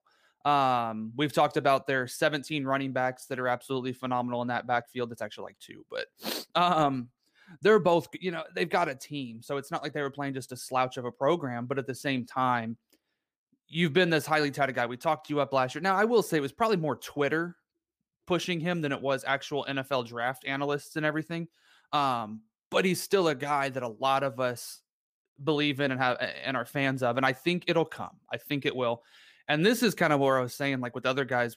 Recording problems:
none

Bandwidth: 15 kHz